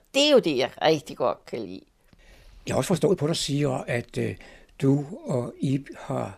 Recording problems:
uneven, jittery; strongly; from 0.5 to 6 s

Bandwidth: 14.5 kHz